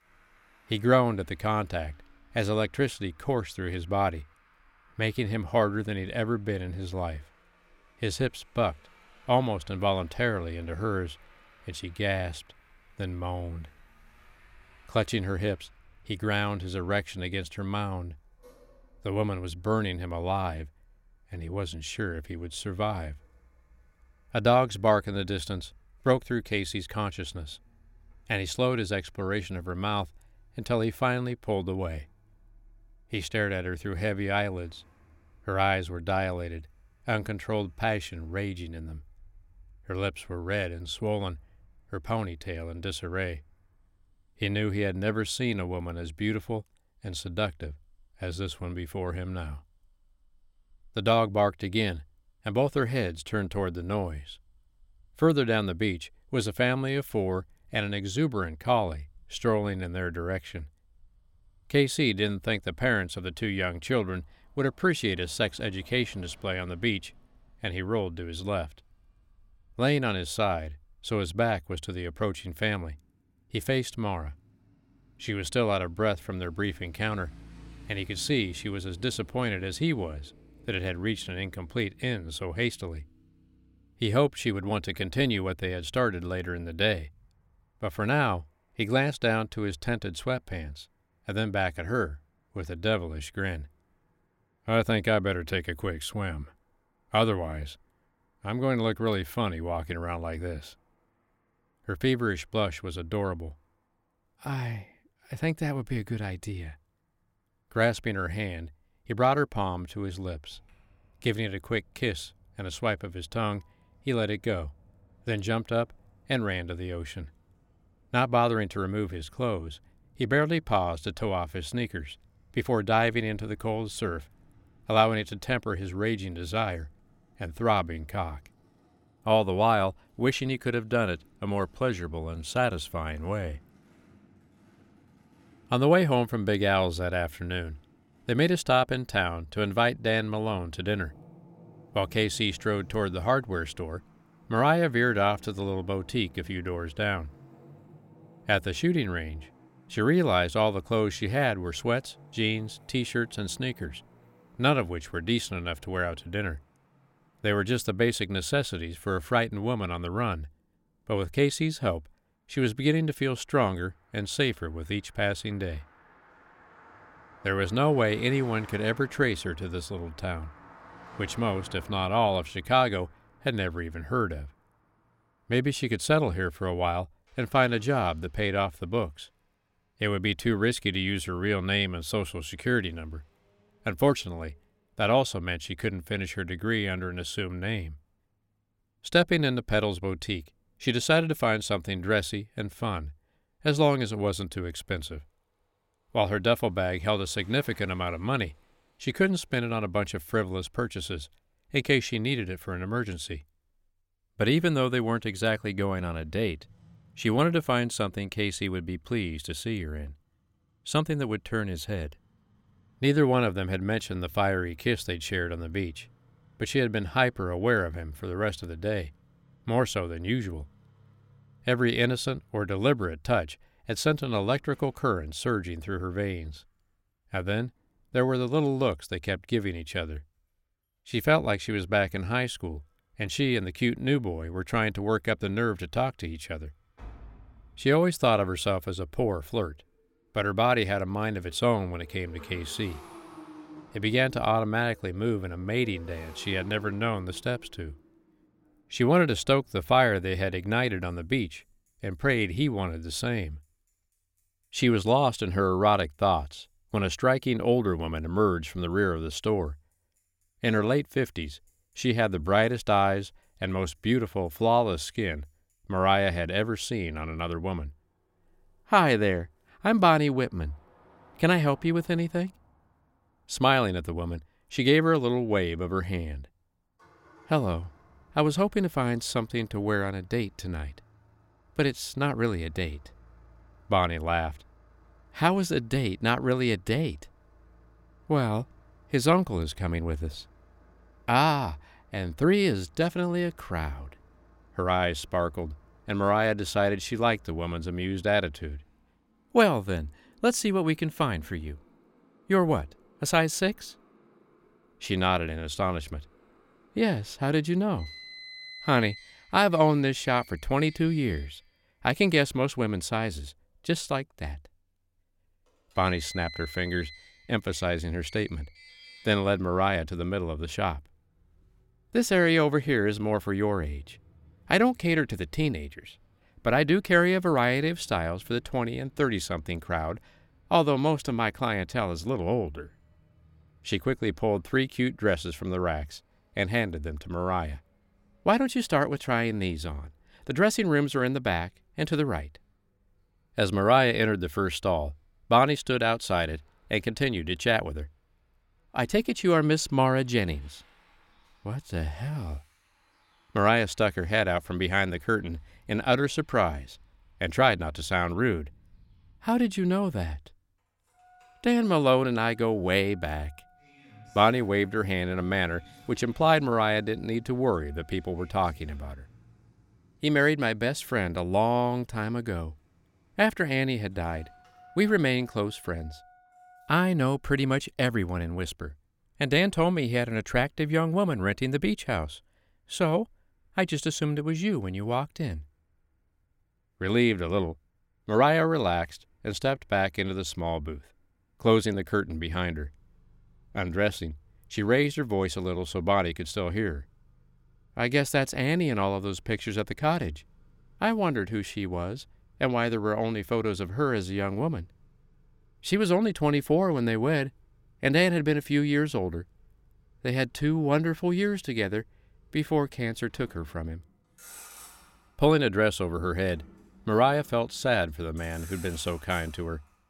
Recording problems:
traffic noise; faint; throughout; 25 dB below the speech

